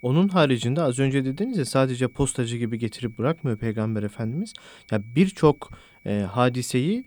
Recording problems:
high-pitched whine; faint; throughout; 2.5 kHz, 30 dB below the speech

